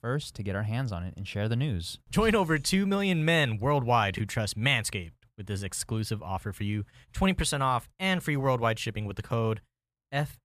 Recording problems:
none

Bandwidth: 14.5 kHz